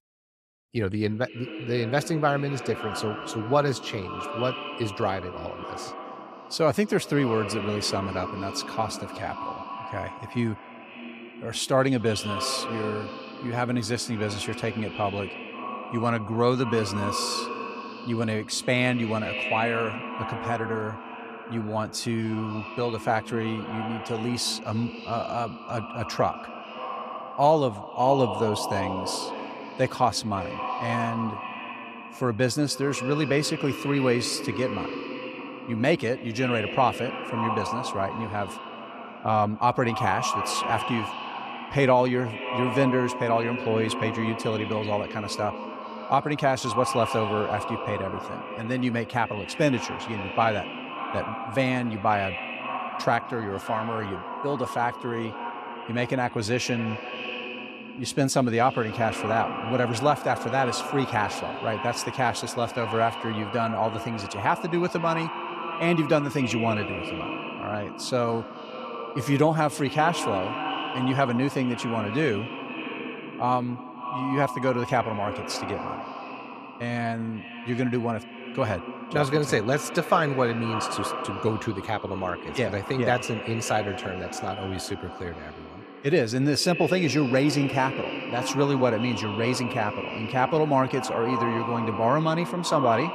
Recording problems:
echo of what is said; strong; throughout; 250 ms later, 7 dB below the speech

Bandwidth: 14.5 kHz